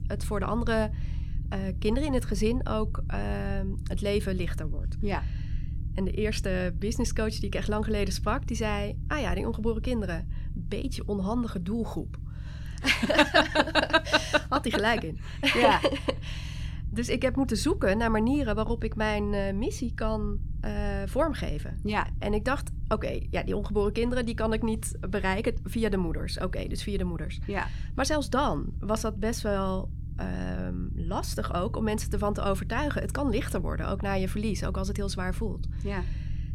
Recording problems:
low rumble; faint; throughout; 20 dB below the speech

